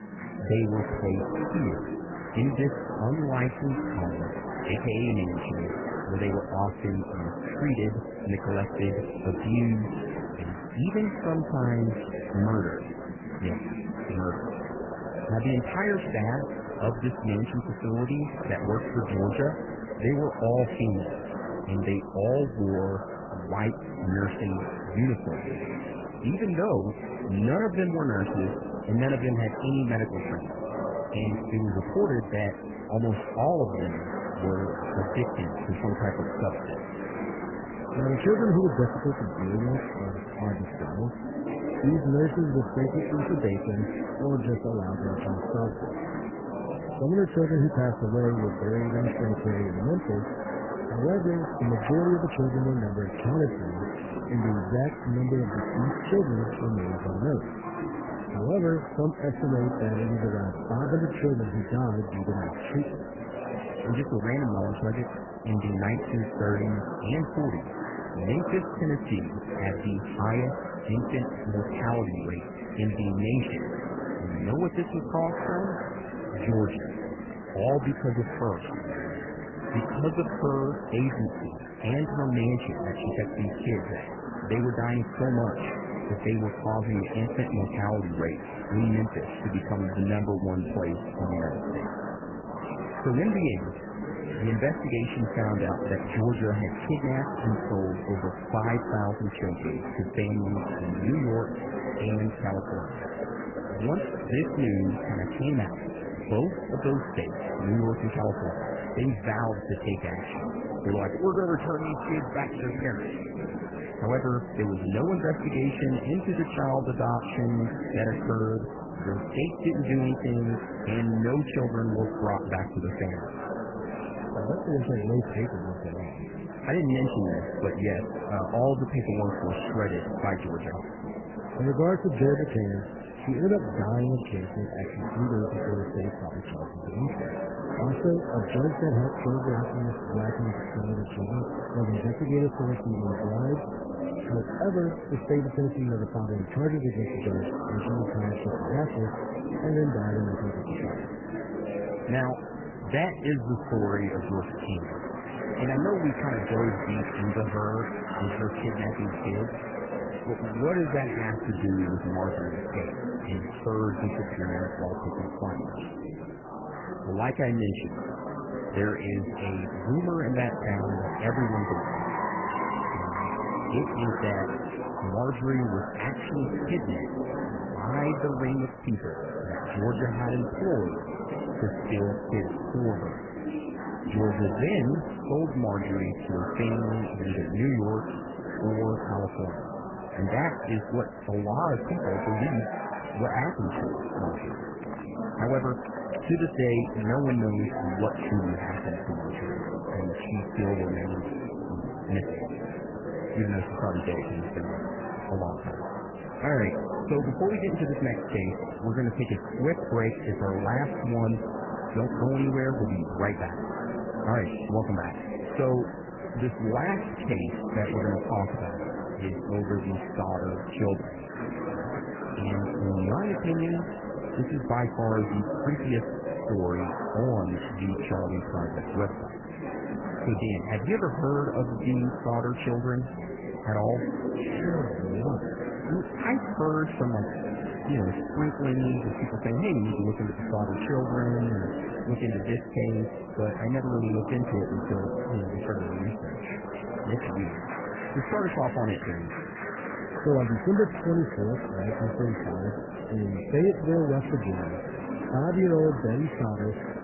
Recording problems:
garbled, watery; badly; nothing above 3 kHz
chatter from many people; loud; throughout; 6 dB below the speech

